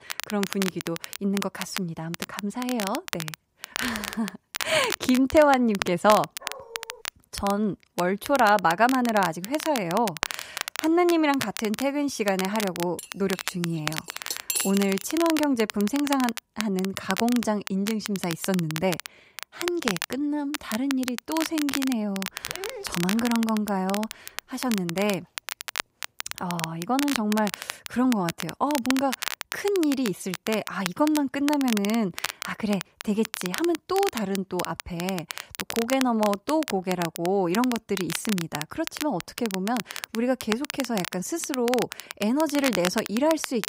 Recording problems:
crackle, like an old record; loud; 8 dB below the speech
dog barking; faint; at 6.5 s and at 22 s; peak 10 dB below the speech
clattering dishes; noticeable; from 13 to 15 s; peak level with the speech

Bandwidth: 15.5 kHz